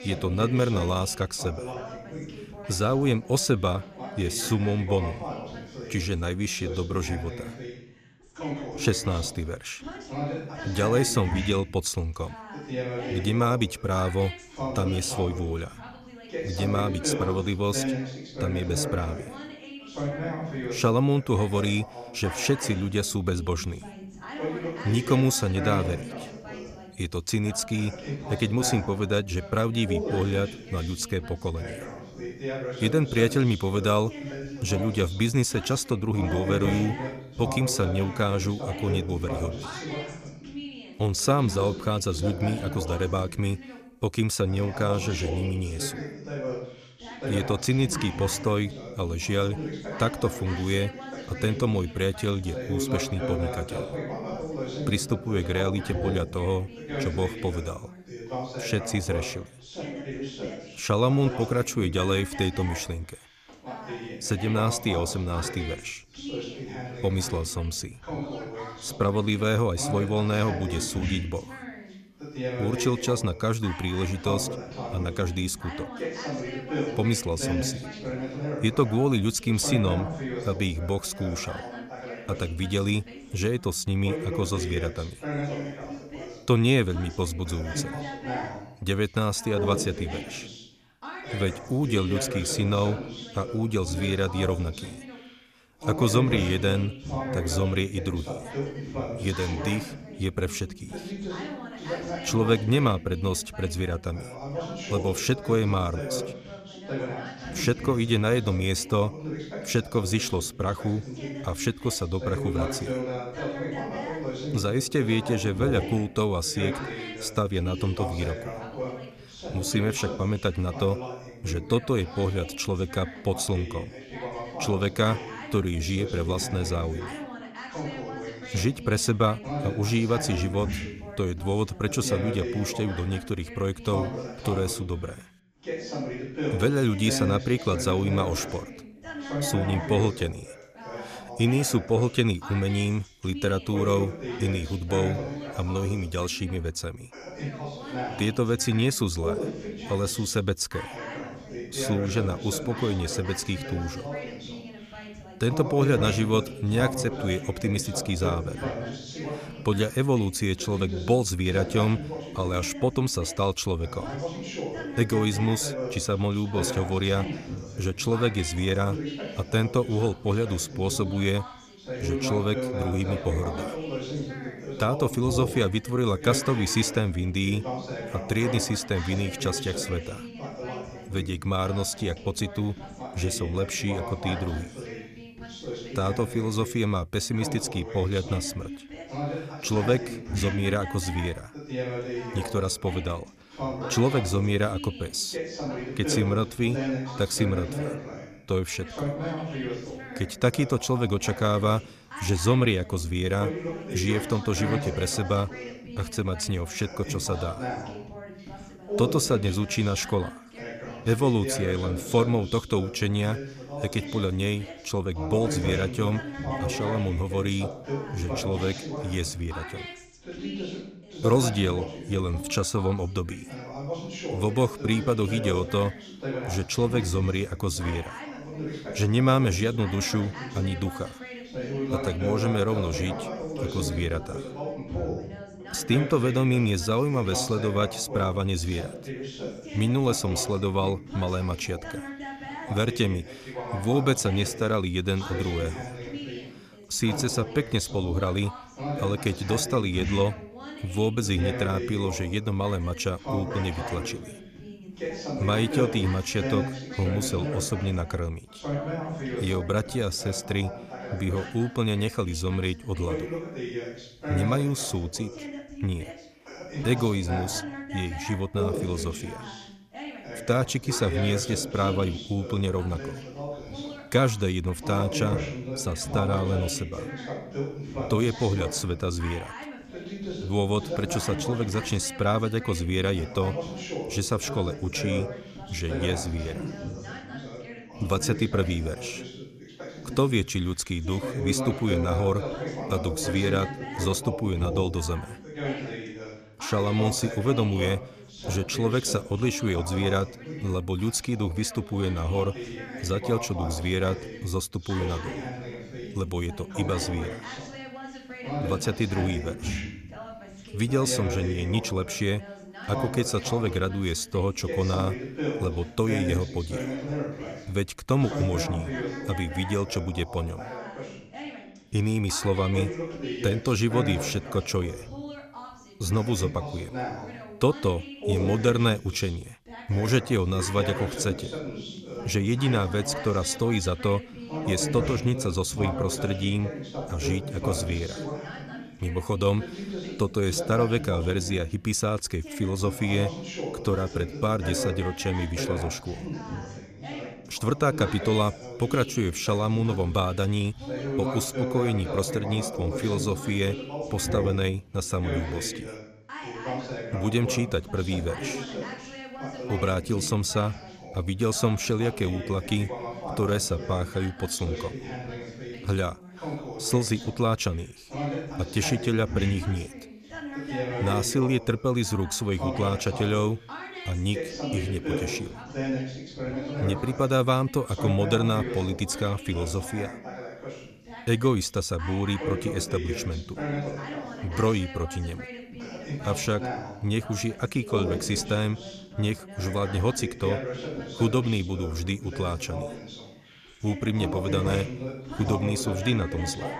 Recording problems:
background chatter; loud; throughout; 2 voices, 8 dB below the speech

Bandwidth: 14.5 kHz